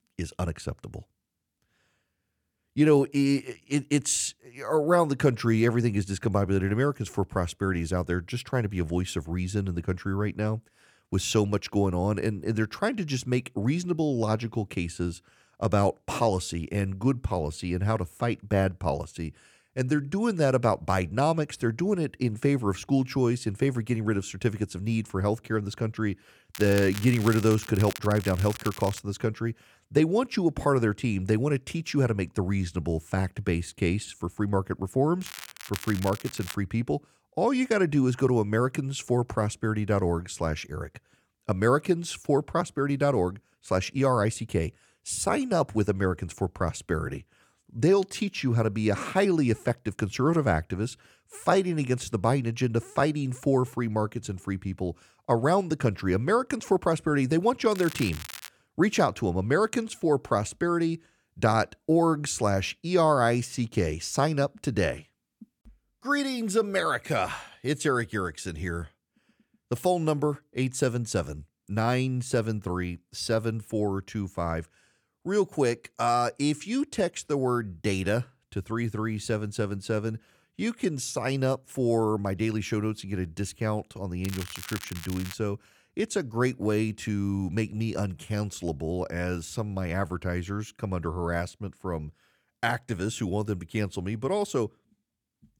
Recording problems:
crackling; noticeable; 4 times, first at 27 s; 15 dB below the speech

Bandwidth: 18 kHz